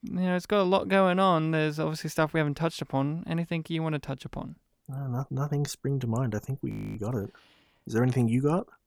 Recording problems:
audio freezing; at 6.5 s

